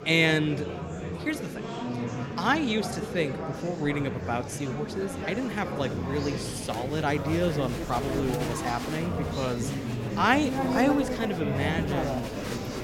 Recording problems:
murmuring crowd; loud; throughout; 3 dB below the speech

